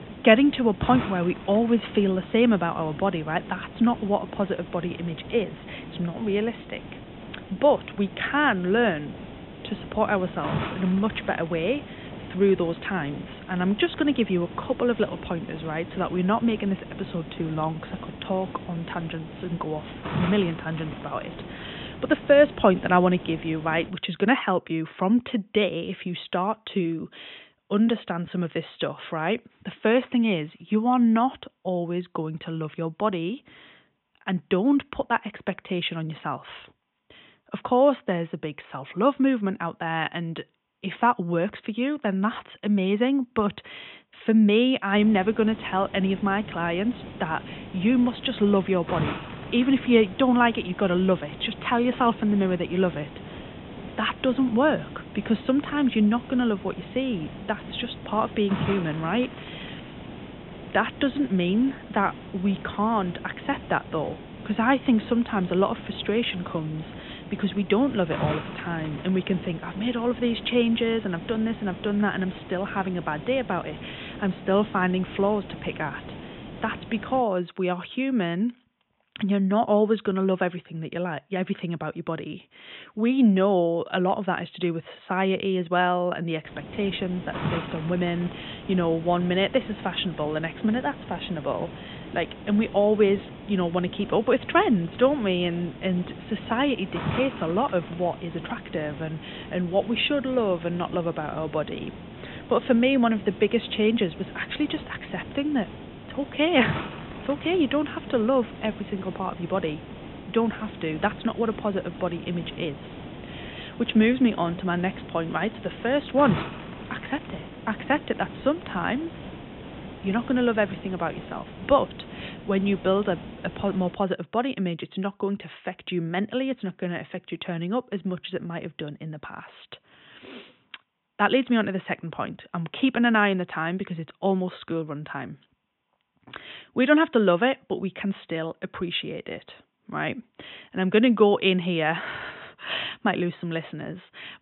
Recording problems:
high frequencies cut off; severe; nothing above 3.5 kHz
hiss; noticeable; until 24 s, from 45 s to 1:17 and from 1:26 to 2:04; 15 dB below the speech

